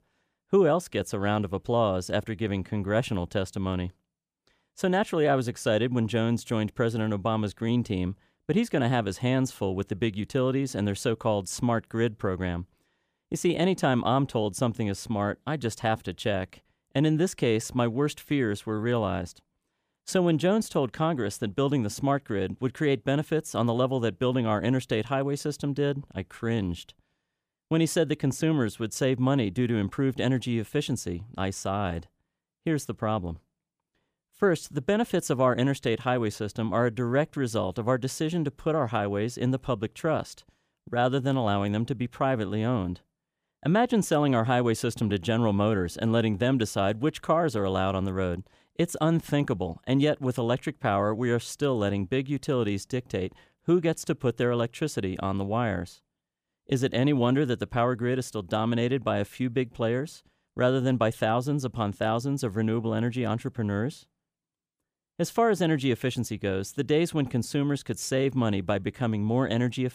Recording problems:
none

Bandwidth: 15 kHz